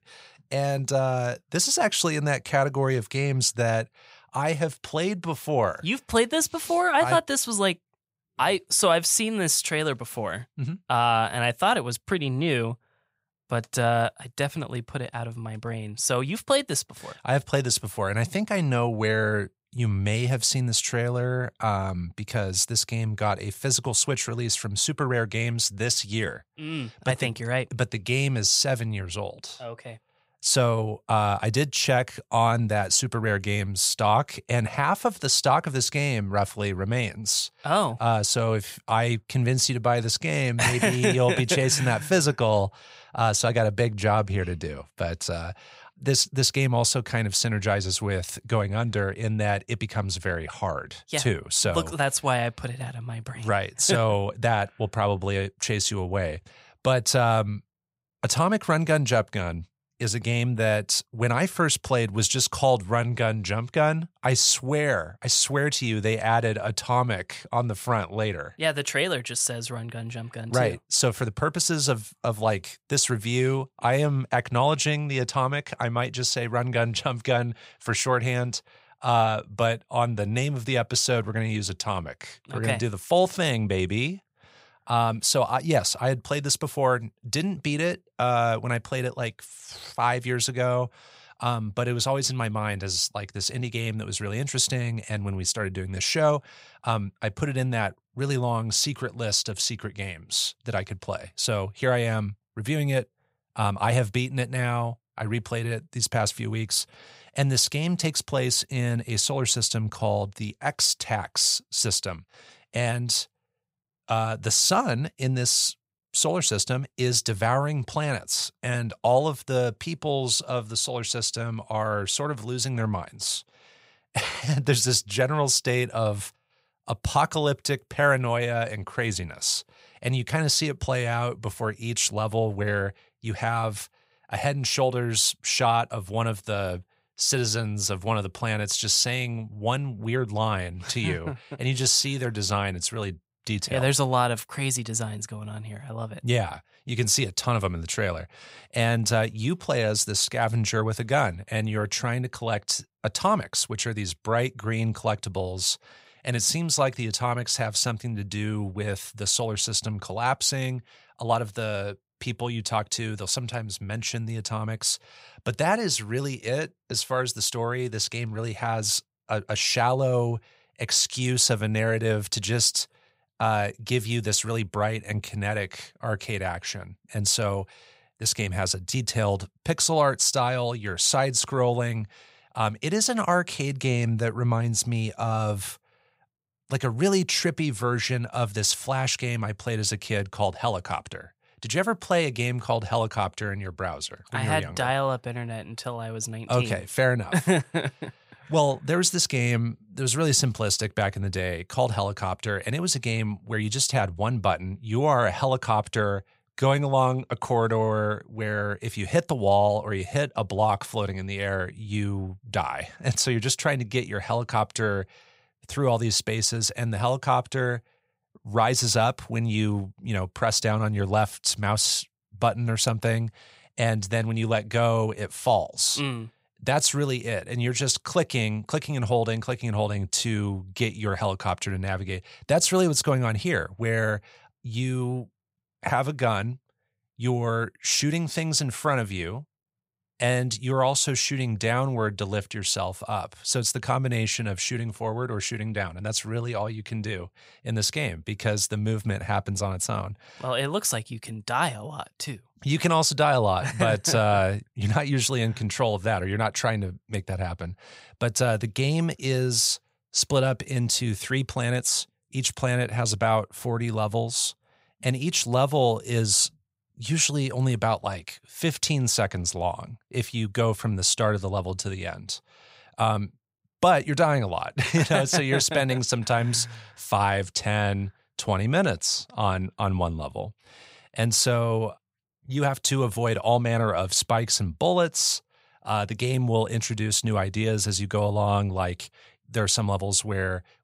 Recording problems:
none

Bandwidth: 15.5 kHz